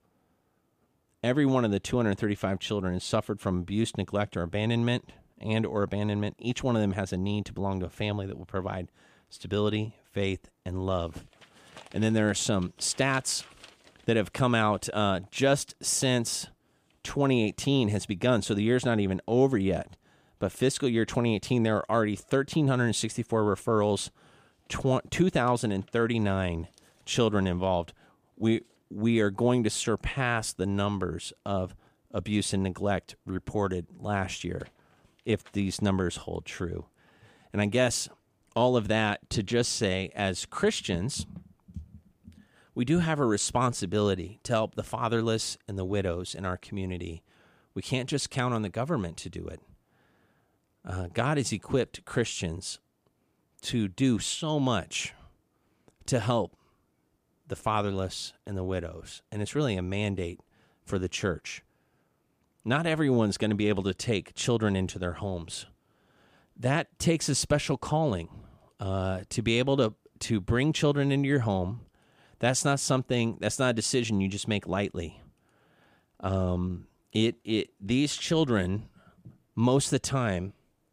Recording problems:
none

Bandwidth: 15 kHz